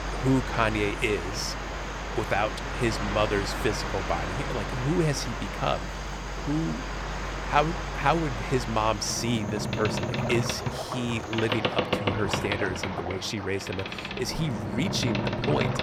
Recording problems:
train or aircraft noise; loud; throughout; 3 dB below the speech
animal sounds; faint; throughout; 20 dB below the speech

